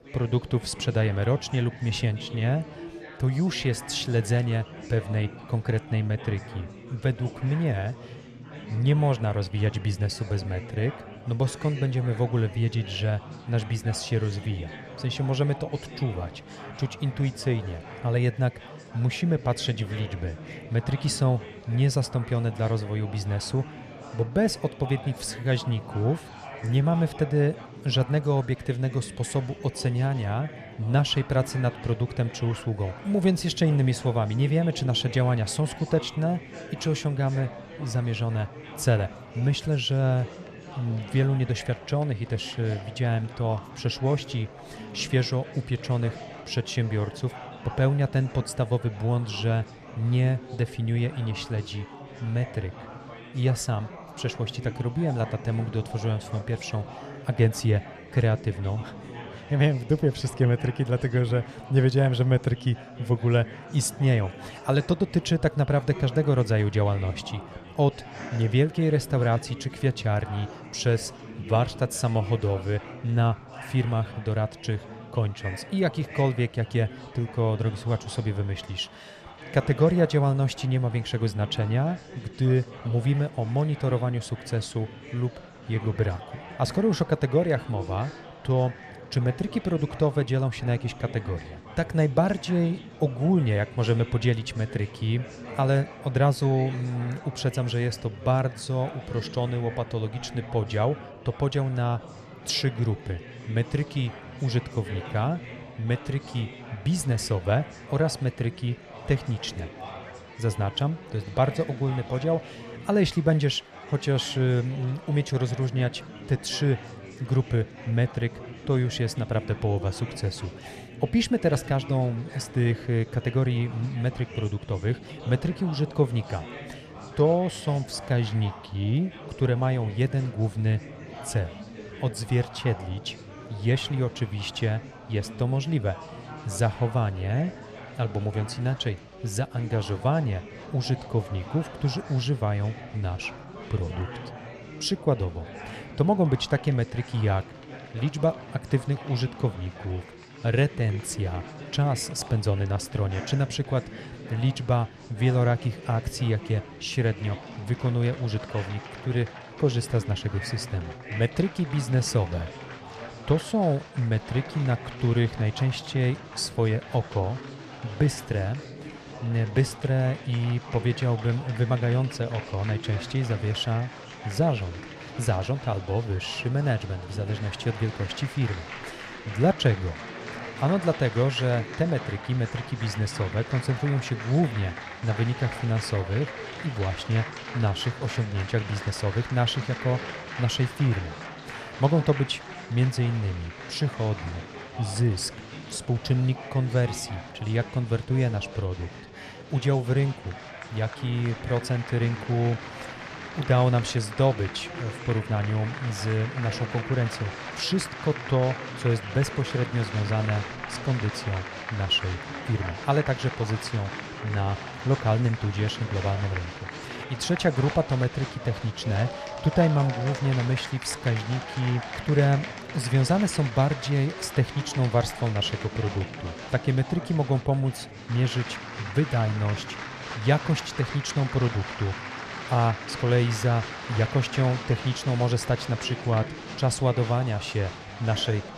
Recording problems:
chatter from many people; noticeable; throughout; 15 dB below the speech

